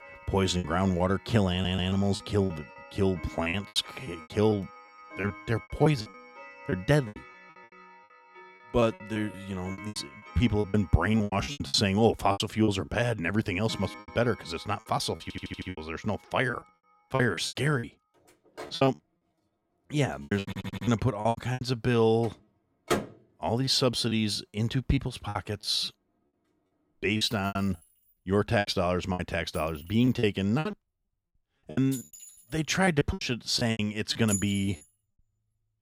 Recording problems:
household noises; noticeable; throughout; 15 dB below the speech
choppy; very; 14% of the speech affected
audio stuttering; at 1.5 s, at 15 s and at 20 s

